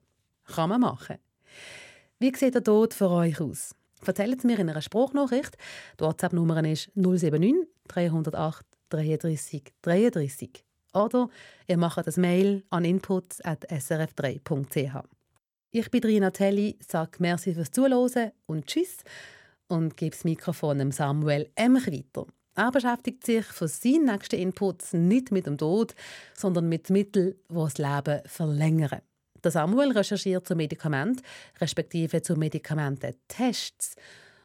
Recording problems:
none

